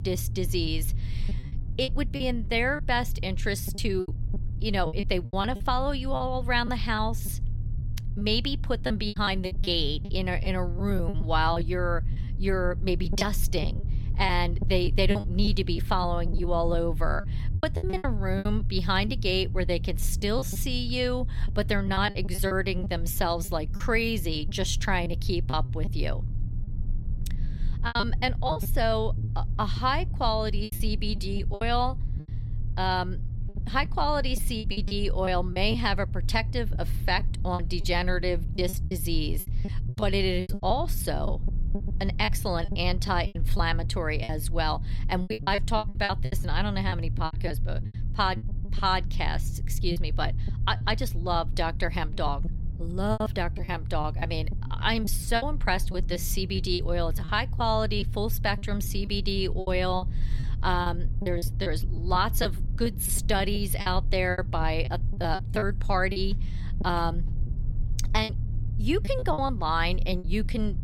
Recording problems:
low rumble; noticeable; throughout; 20 dB below the speech
choppy; very; 10% of the speech affected

